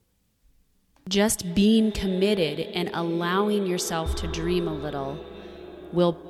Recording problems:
echo of what is said; noticeable; throughout; 250 ms later, 10 dB below the speech

